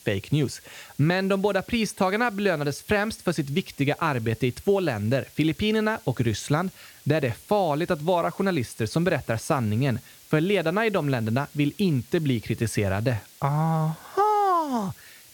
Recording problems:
hiss; faint; throughout; 25 dB below the speech

